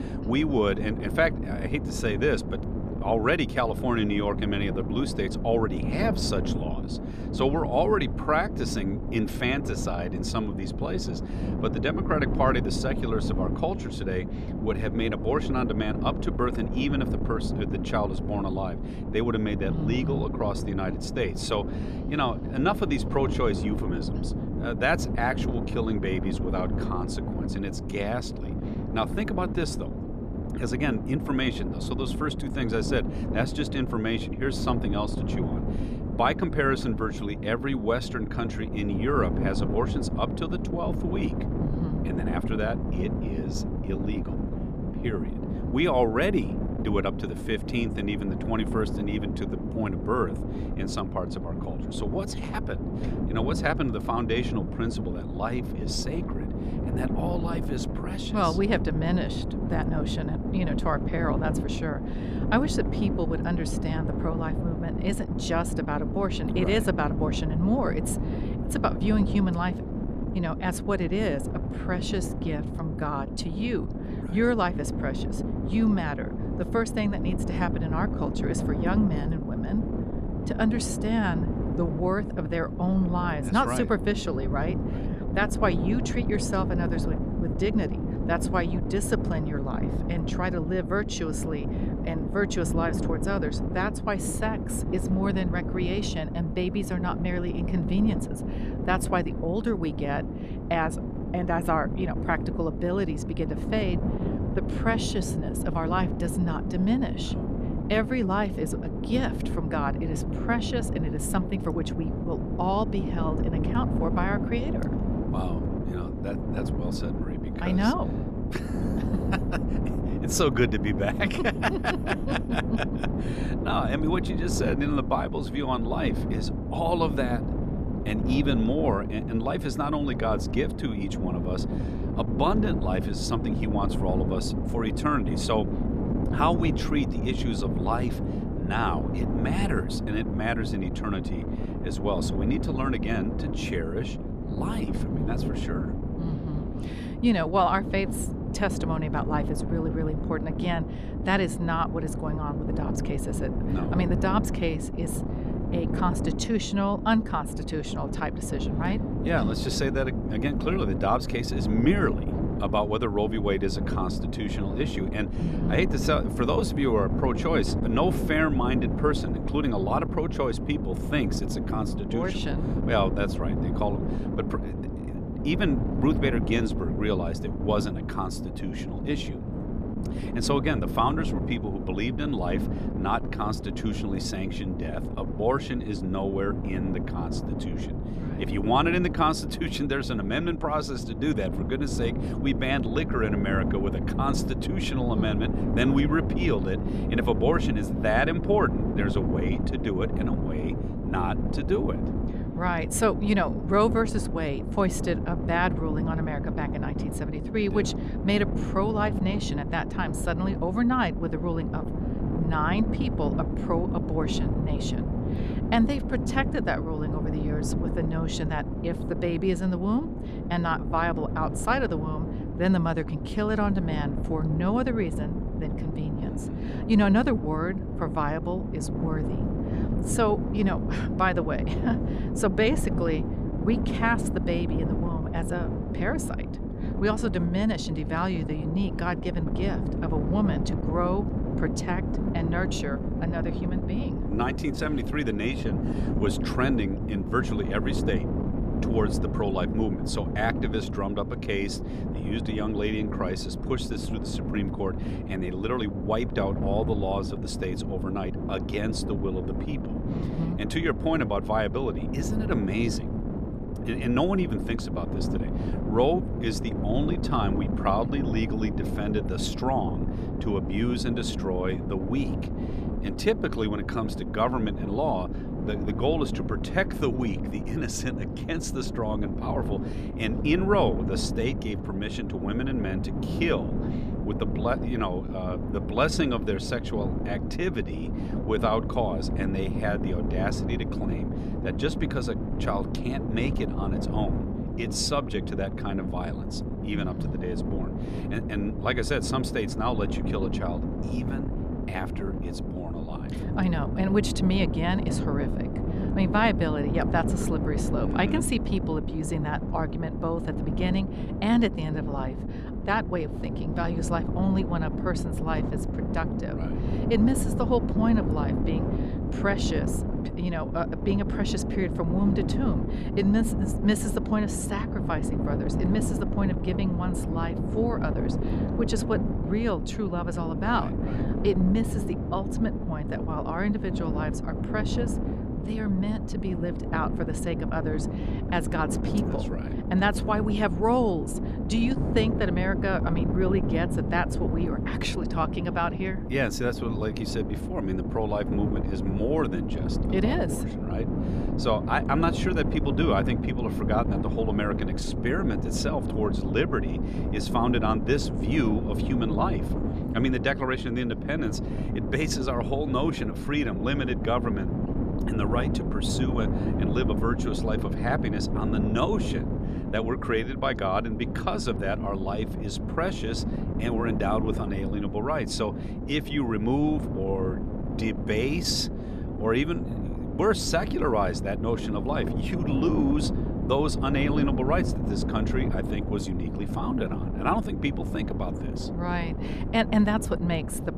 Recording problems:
wind noise on the microphone; heavy; 7 dB below the speech

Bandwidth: 14 kHz